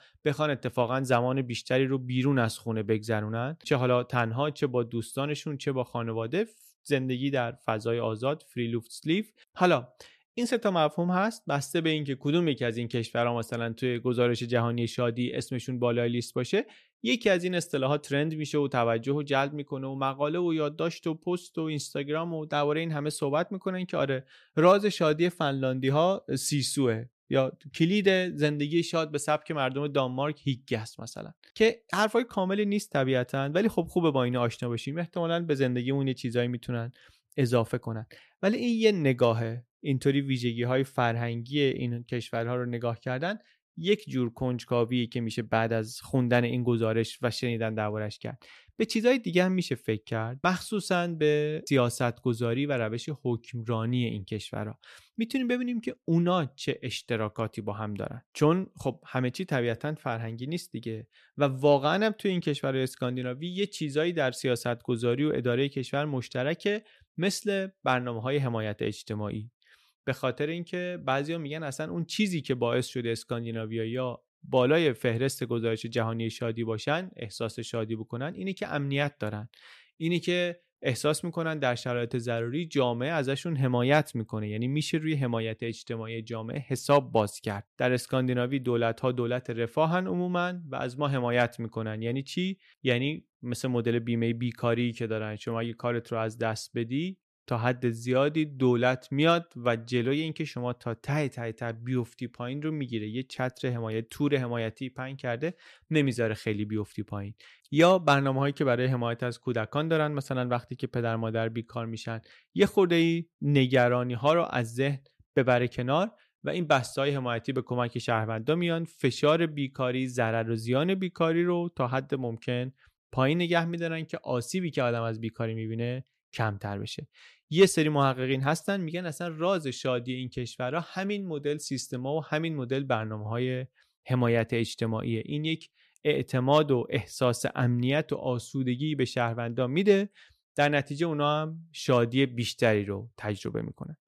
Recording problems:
none

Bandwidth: 14 kHz